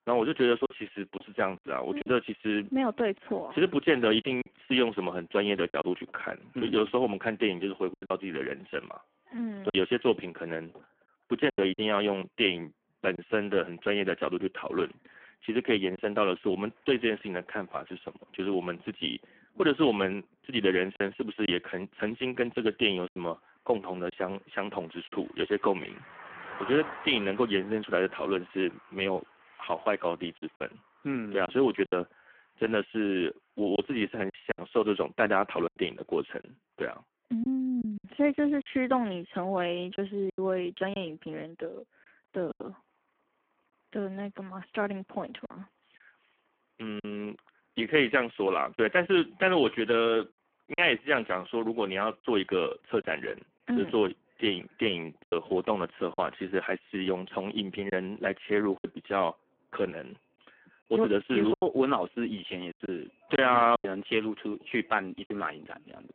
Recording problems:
phone-call audio; poor line; nothing above 3 kHz
traffic noise; faint; throughout; 20 dB below the speech
choppy; occasionally; 4% of the speech affected

